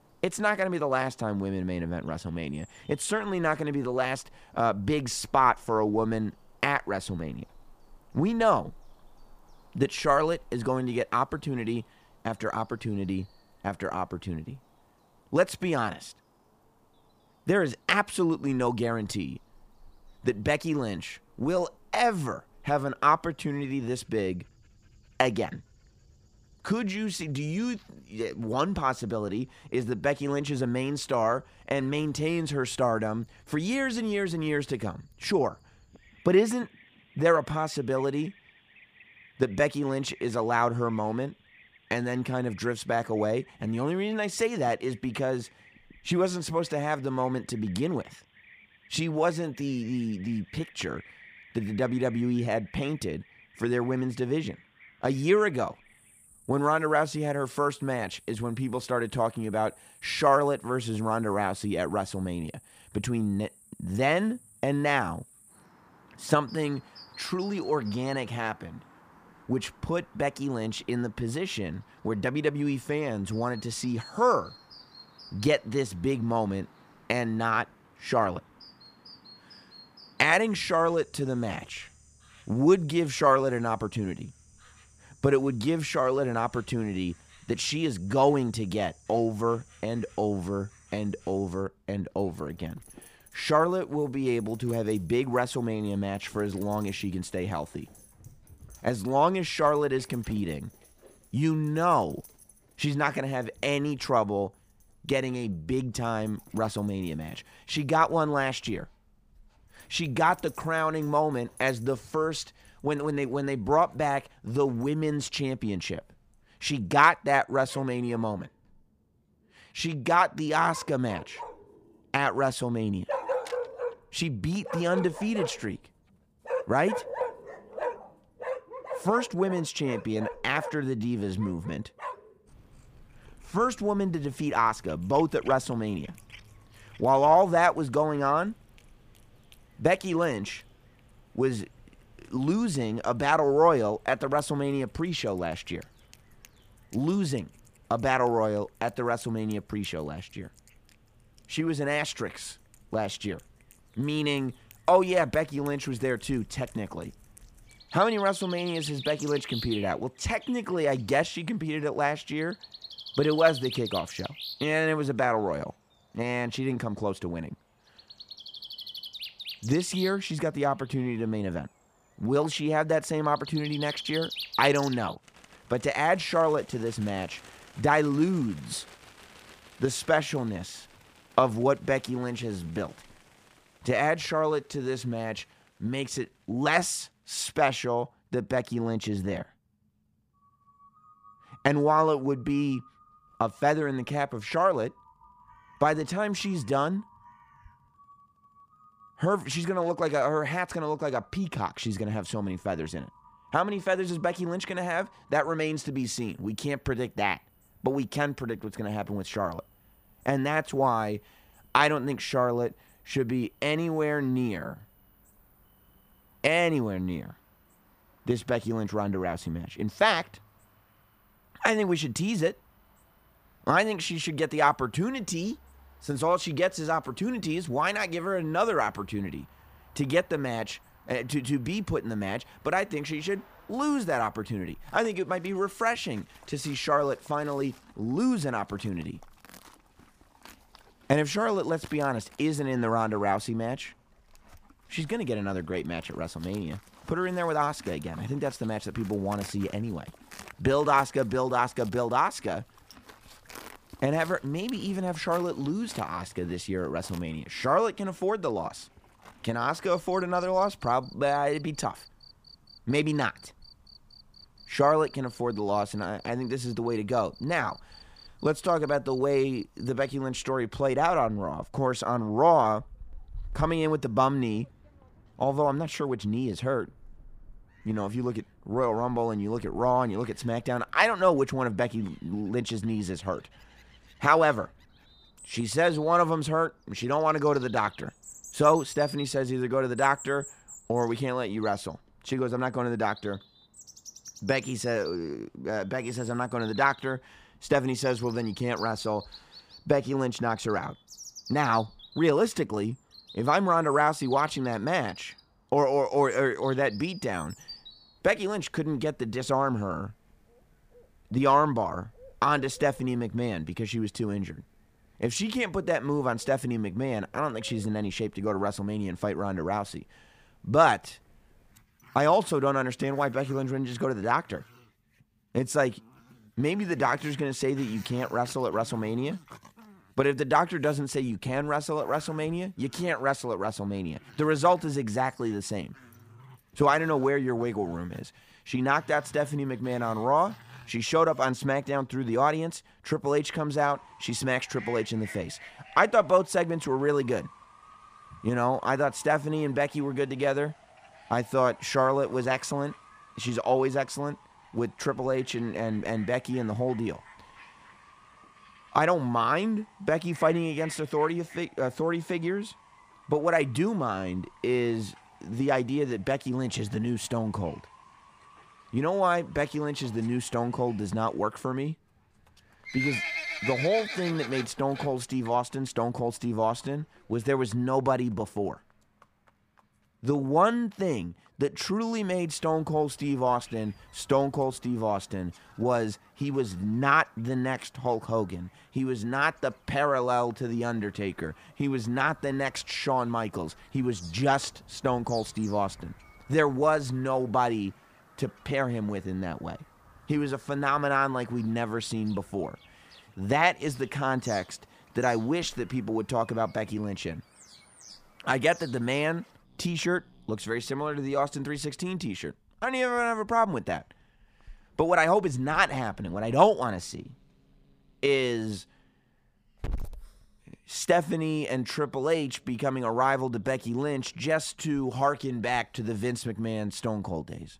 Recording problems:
animal sounds; noticeable; throughout; 20 dB below the speech

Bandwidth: 15 kHz